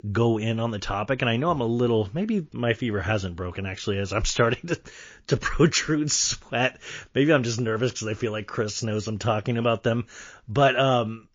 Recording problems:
garbled, watery; slightly

